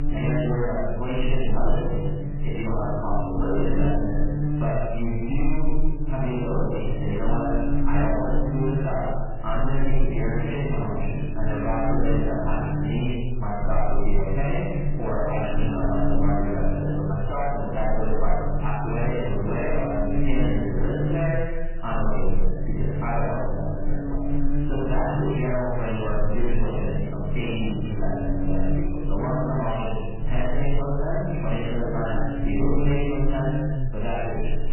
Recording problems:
room echo; strong; dies away in 1.3 s
off-mic speech; far
garbled, watery; badly; nothing above 3 kHz
distortion; slight; 10 dB below the speech
electrical hum; very faint; throughout; 60 Hz, 7 dB below the speech

